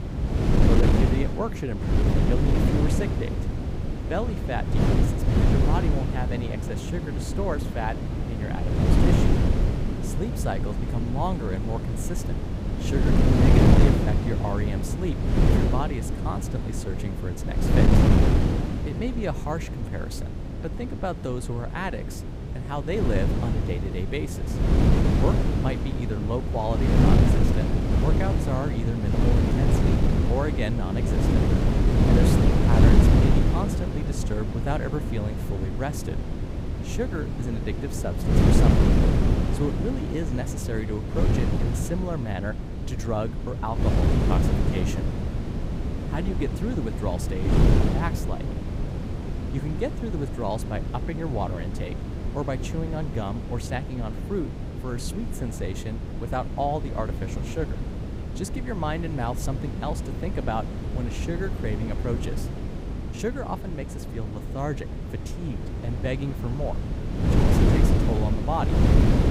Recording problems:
wind noise on the microphone; heavy; 1 dB above the speech

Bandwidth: 15.5 kHz